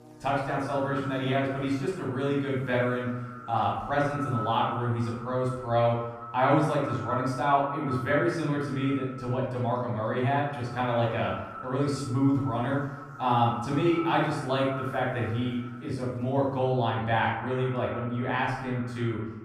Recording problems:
off-mic speech; far
echo of what is said; noticeable; throughout; 210 ms later, 15 dB below the speech
room echo; noticeable; dies away in 0.7 s
electrical hum; faint; until 7 s and from 8.5 to 17 s; 60 Hz, 25 dB below the speech

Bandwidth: 15 kHz